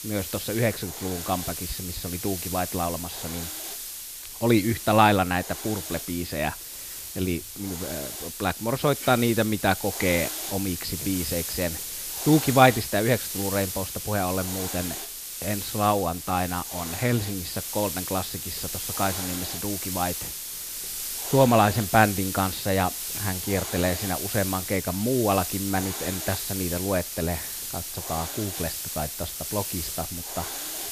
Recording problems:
high frequencies cut off; noticeable; nothing above 5.5 kHz
hiss; loud; throughout; 5 dB below the speech

